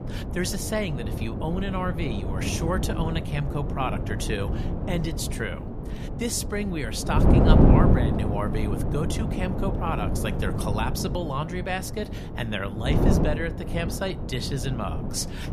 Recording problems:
wind noise on the microphone; heavy; 2 dB below the speech

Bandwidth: 14.5 kHz